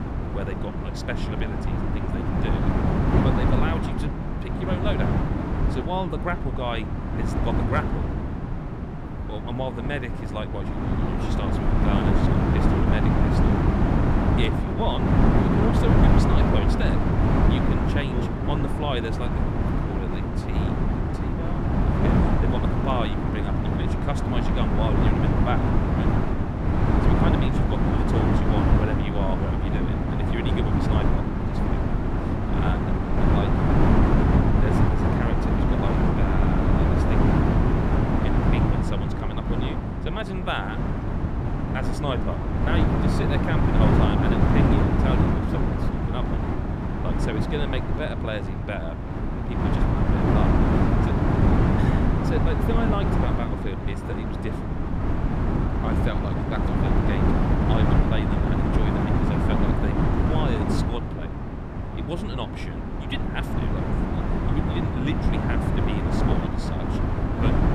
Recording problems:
wind noise on the microphone; heavy; 4 dB above the speech

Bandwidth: 14.5 kHz